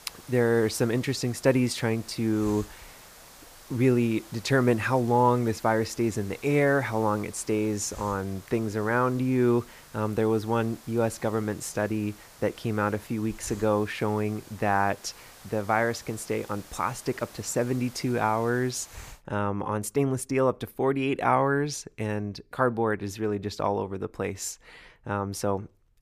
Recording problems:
hiss; faint; until 19 s; 20 dB below the speech

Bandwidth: 15 kHz